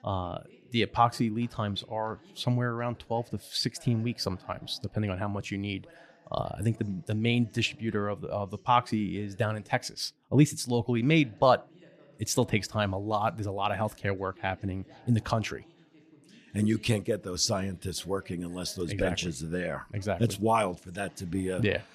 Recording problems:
voice in the background; faint; throughout; 25 dB below the speech

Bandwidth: 14.5 kHz